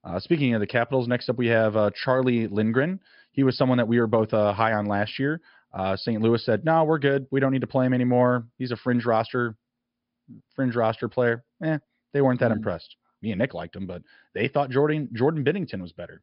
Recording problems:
high frequencies cut off; noticeable; nothing above 5.5 kHz

